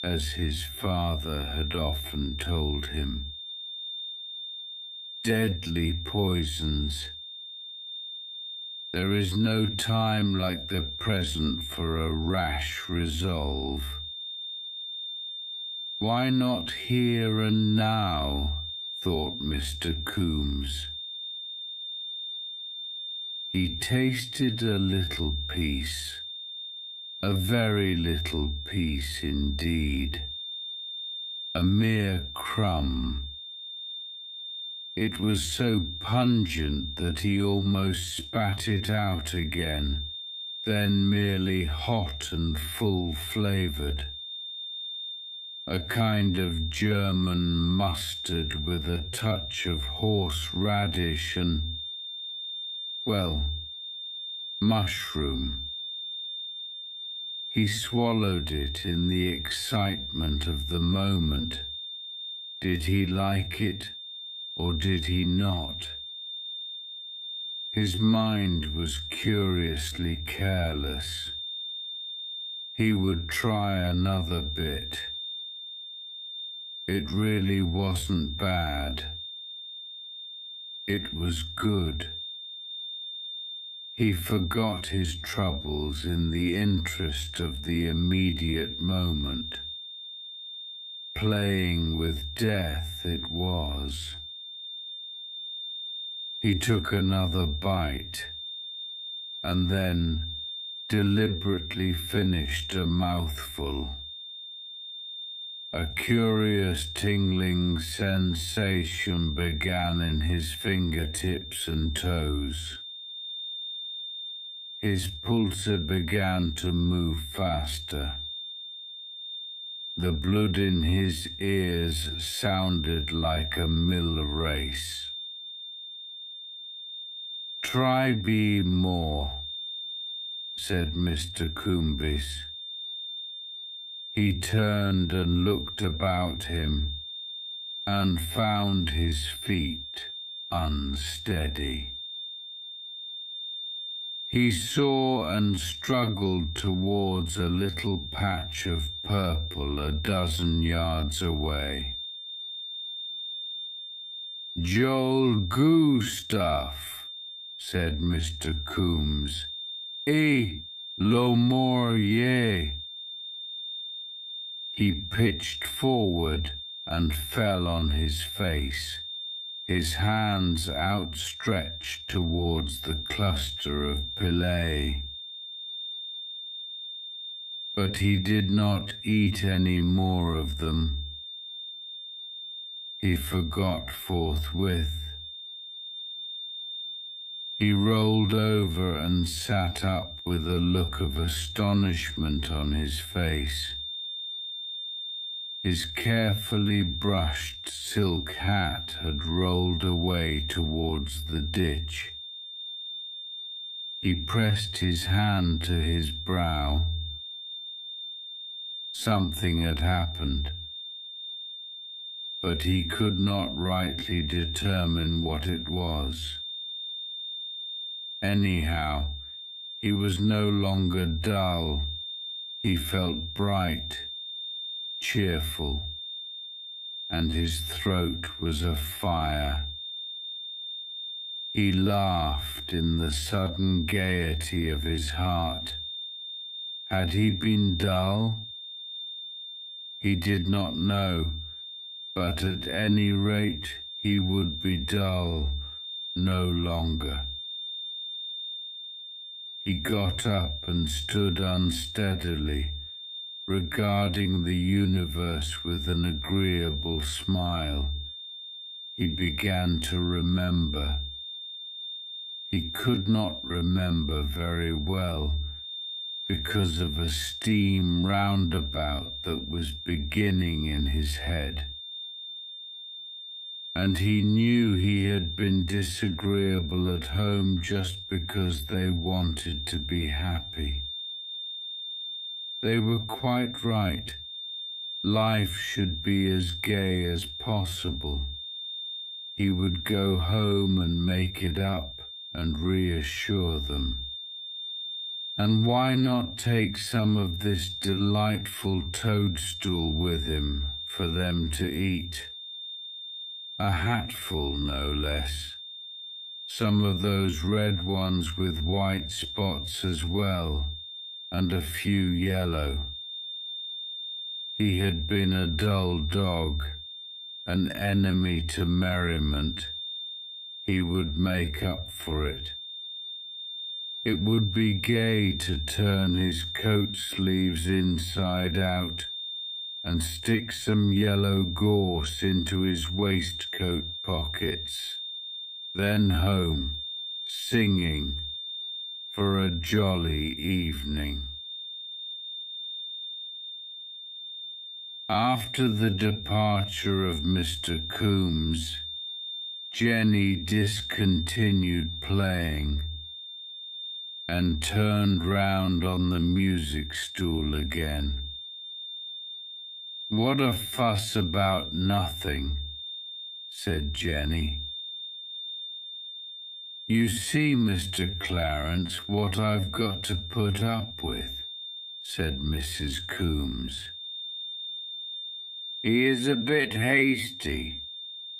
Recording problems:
wrong speed, natural pitch; too slow; 0.5 times normal speed
high-pitched whine; loud; throughout; 3.5 kHz, 7 dB below the speech

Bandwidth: 14.5 kHz